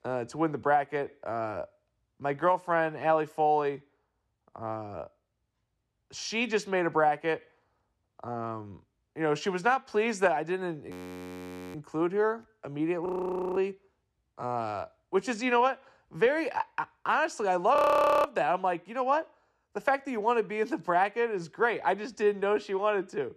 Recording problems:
audio freezing; at 11 s for 1 s, at 13 s for 0.5 s and at 18 s

